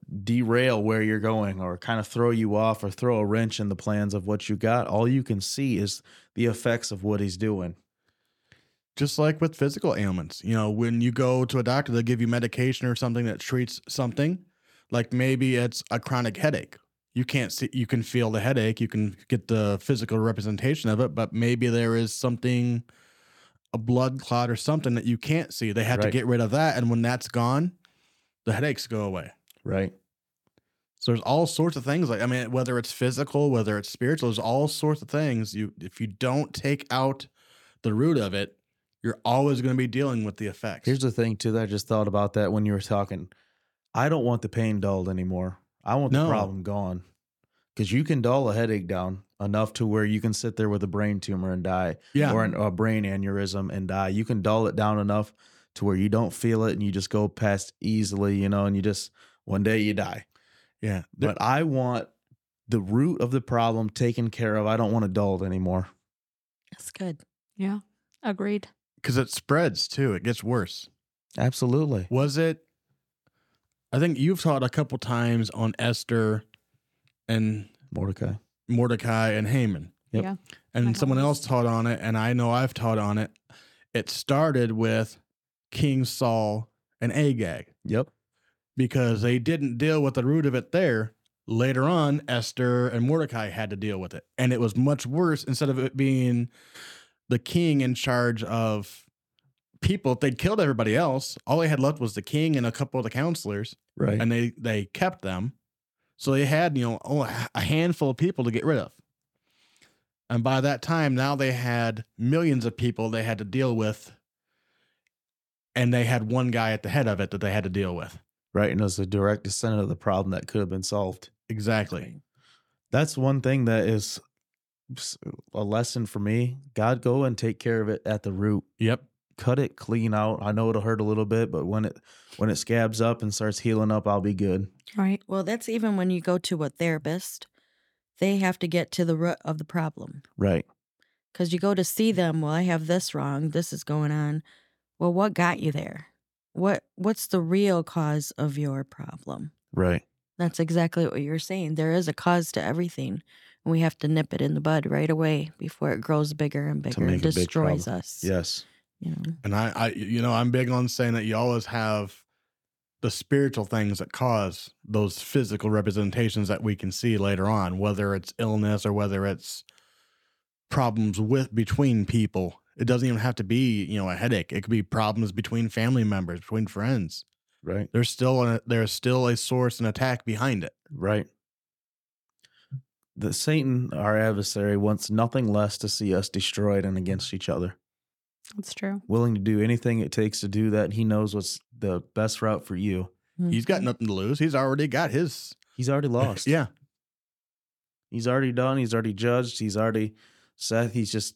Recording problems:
none

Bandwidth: 17 kHz